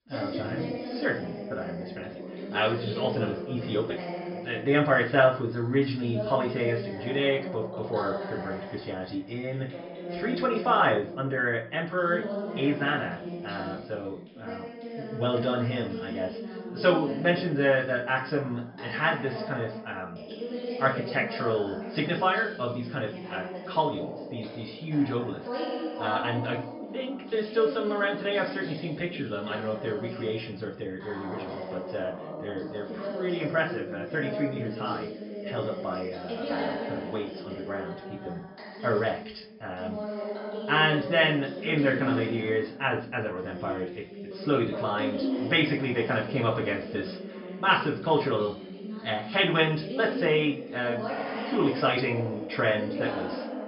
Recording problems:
off-mic speech; far
high frequencies cut off; noticeable; nothing above 5.5 kHz
room echo; slight; dies away in 0.3 s
voice in the background; loud; throughout; 8 dB below the speech

